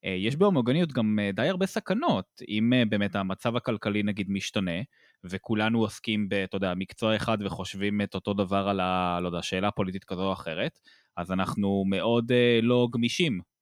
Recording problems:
none

